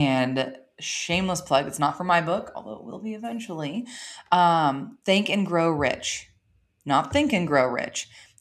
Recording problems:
abrupt cut into speech; at the start

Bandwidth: 13.5 kHz